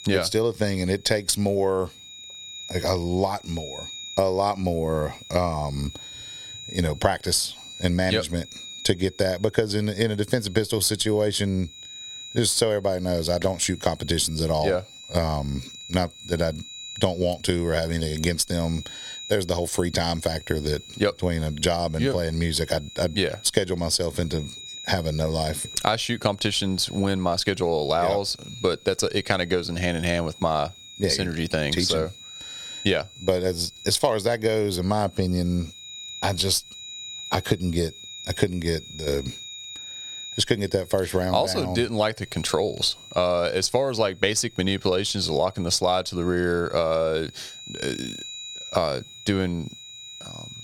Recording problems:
squashed, flat; somewhat
high-pitched whine; noticeable; throughout; 4 kHz, 15 dB below the speech

